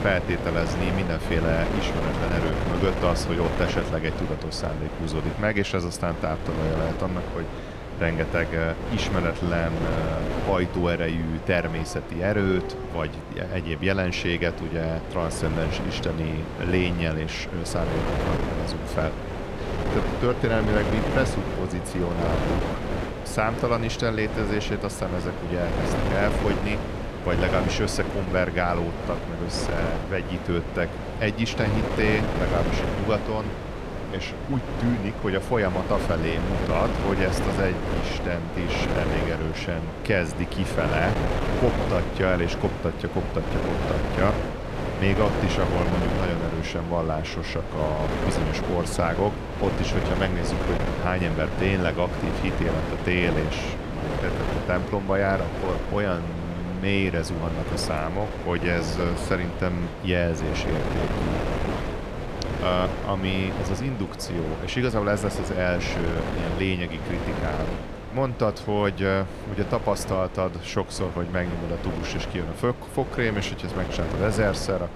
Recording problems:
wind noise on the microphone; heavy; 4 dB below the speech
animal sounds; noticeable; throughout; 20 dB below the speech

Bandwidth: 14.5 kHz